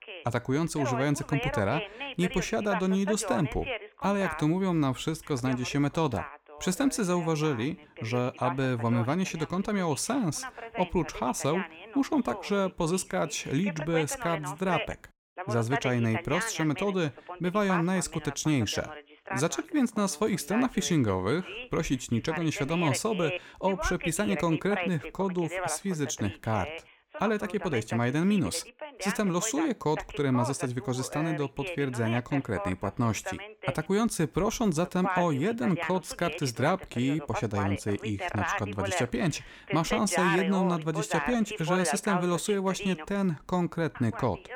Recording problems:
voice in the background; loud; throughout; 7 dB below the speech

